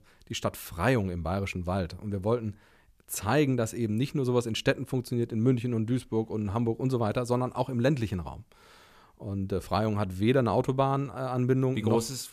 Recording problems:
none

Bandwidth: 14.5 kHz